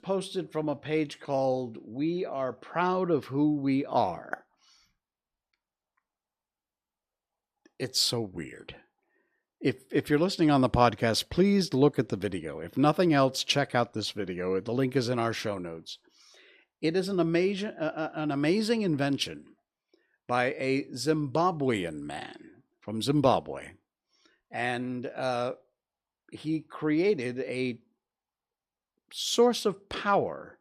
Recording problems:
none

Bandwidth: 14.5 kHz